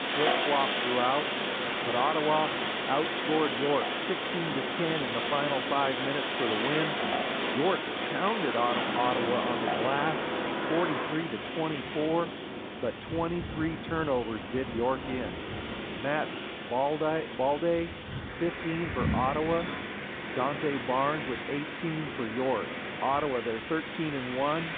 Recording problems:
phone-call audio; nothing above 3.5 kHz
wind in the background; loud; throughout; 1 dB below the speech

